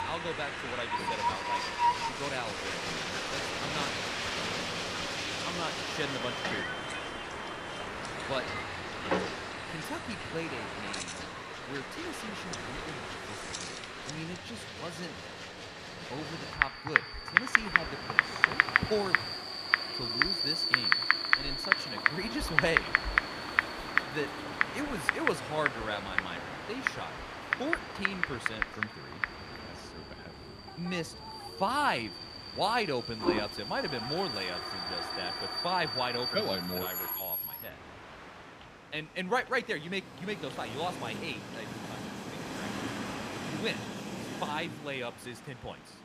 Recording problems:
household noises; very loud; throughout; 4 dB above the speech
train or aircraft noise; loud; throughout; as loud as the speech

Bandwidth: 15 kHz